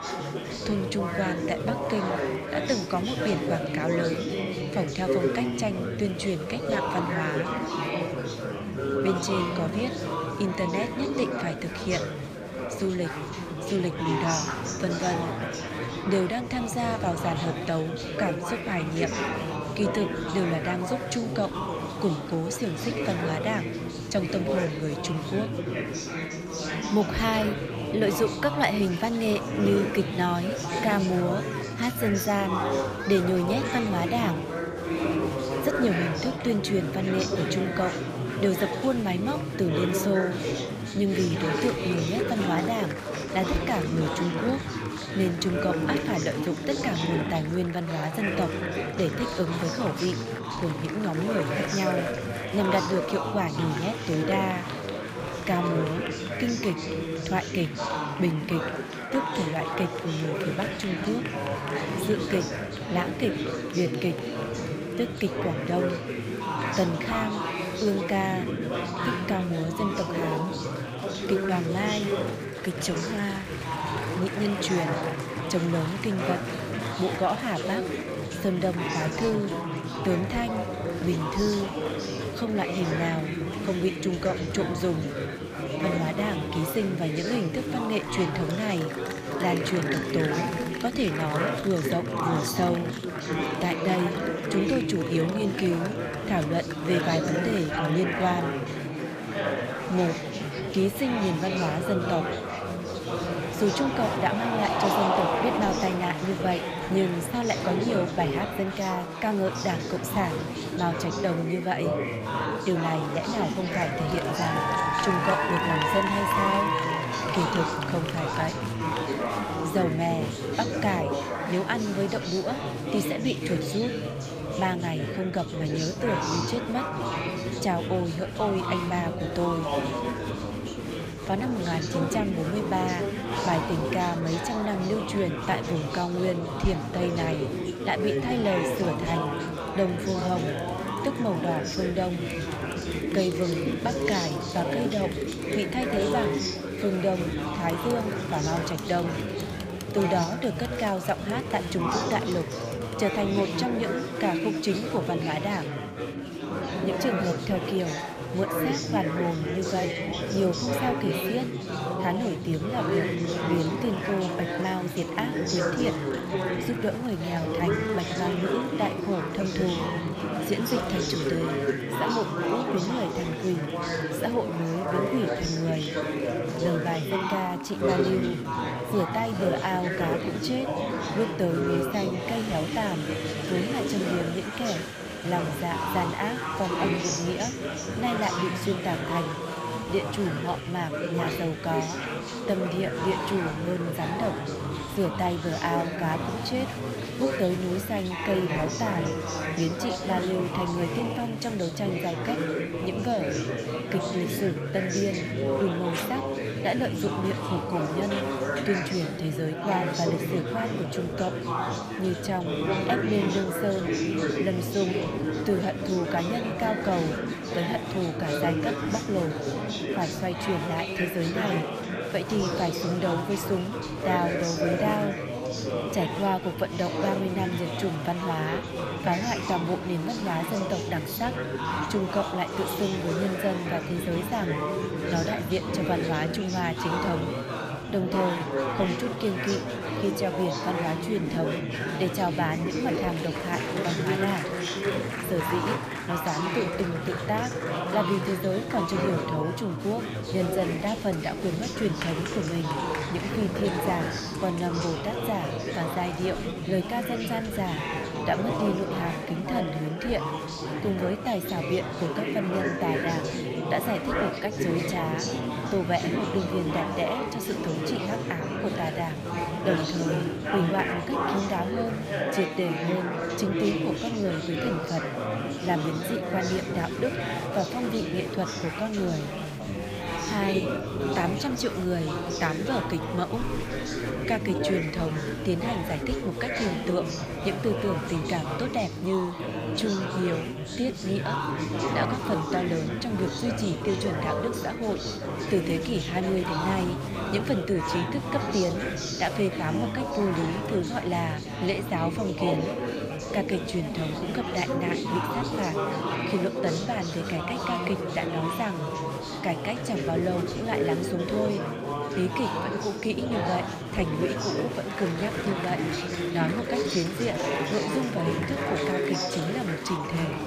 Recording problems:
chatter from many people; loud; throughout; 1 dB below the speech

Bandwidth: 15 kHz